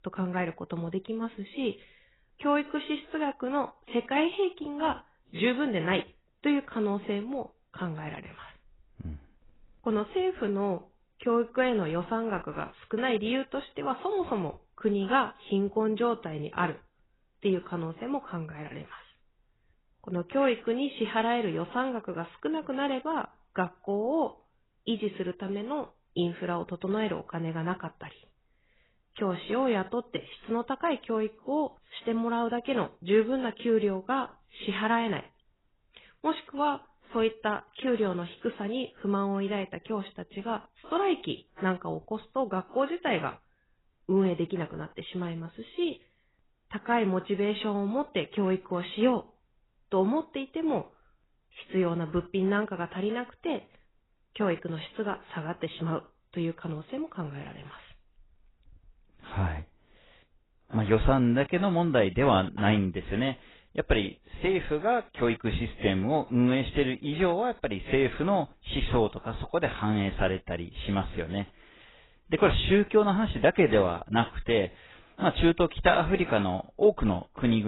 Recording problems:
garbled, watery; badly; nothing above 4 kHz
abrupt cut into speech; at the end

